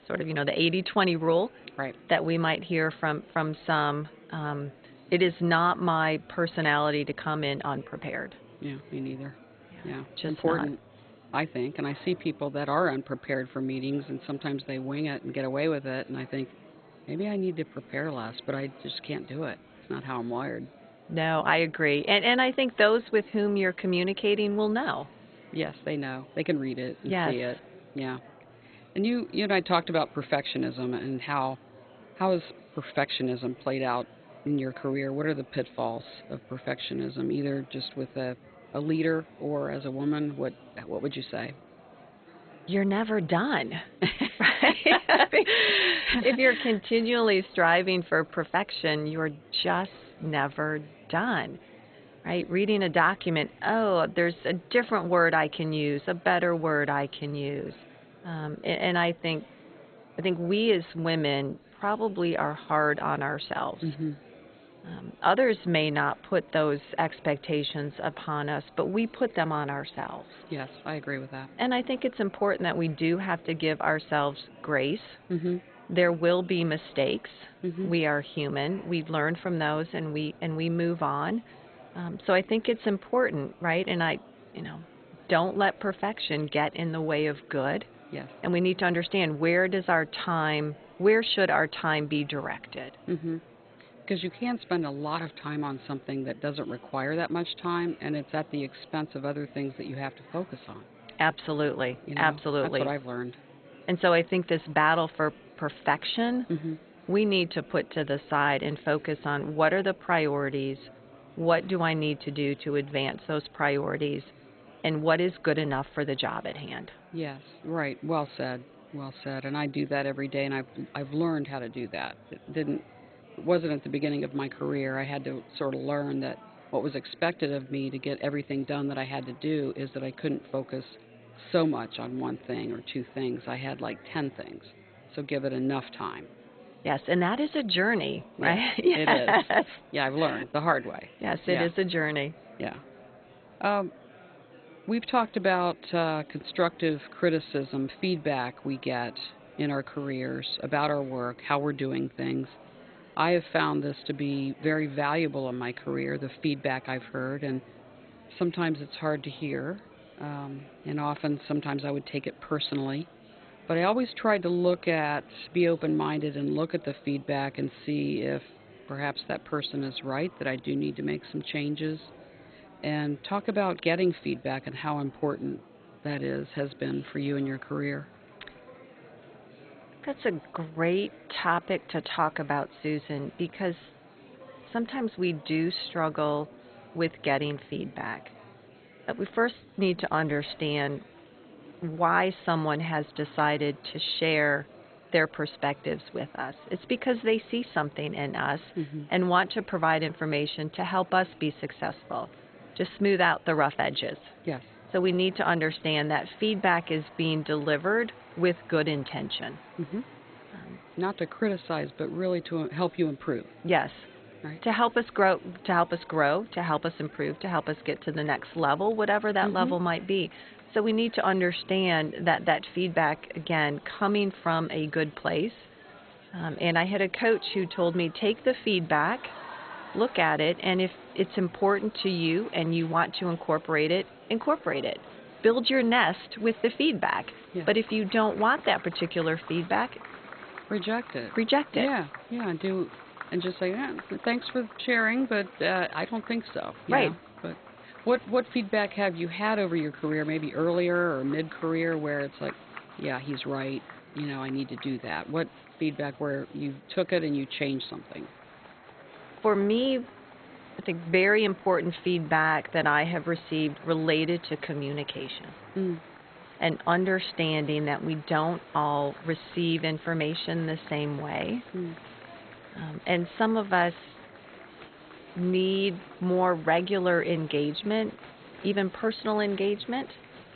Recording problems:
garbled, watery; badly; nothing above 4 kHz
murmuring crowd; faint; throughout; 20 dB below the speech

